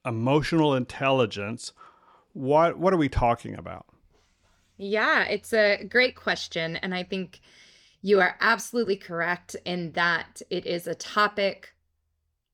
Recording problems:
none

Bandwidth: 18 kHz